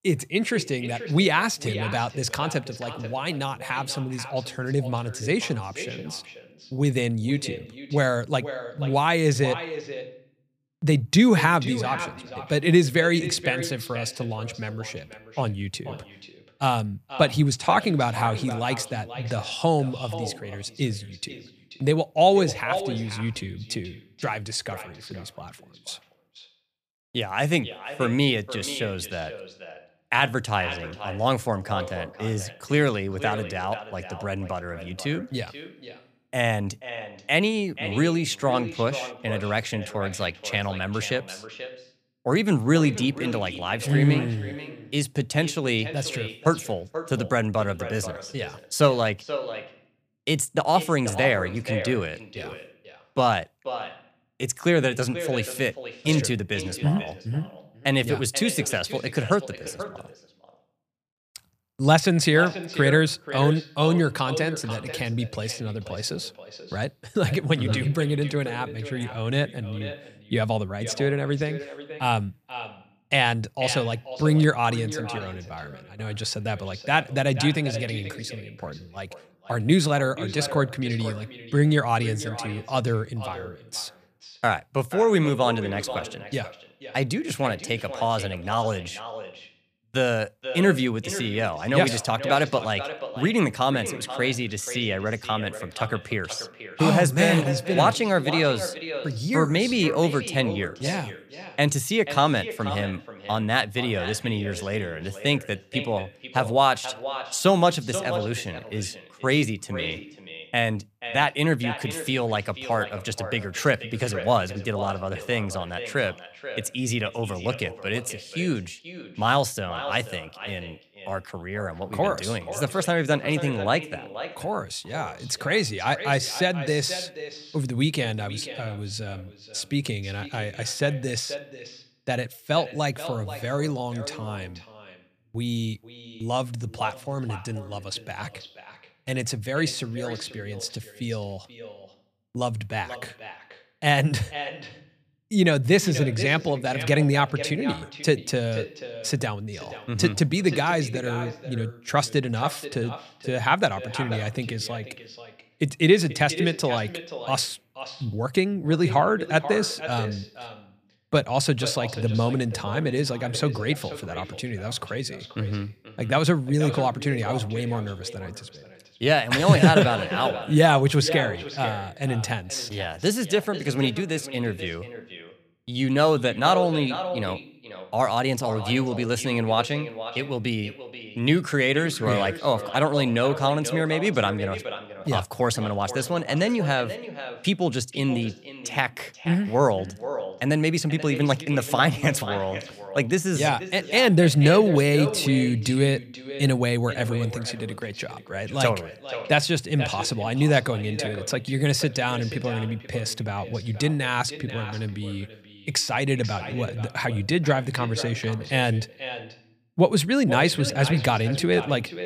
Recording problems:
echo of what is said; strong; throughout; 480 ms later, 10 dB below the speech

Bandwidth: 15 kHz